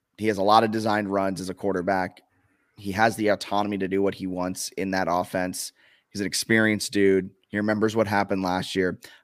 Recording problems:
none

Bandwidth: 15 kHz